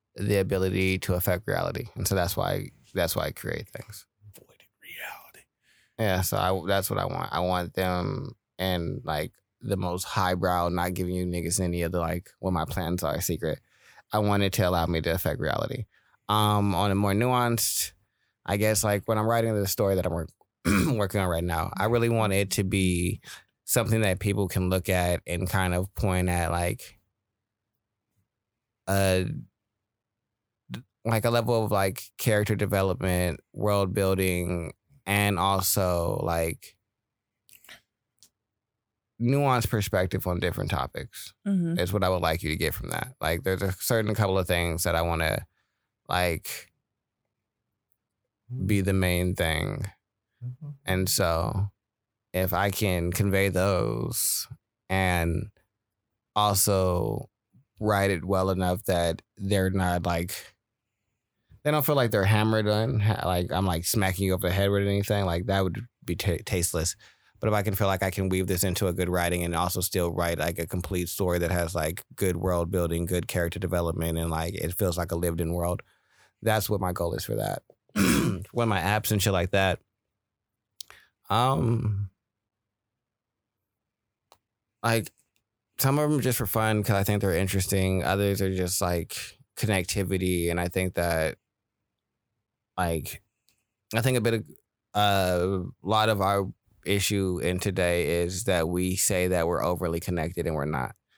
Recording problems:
none

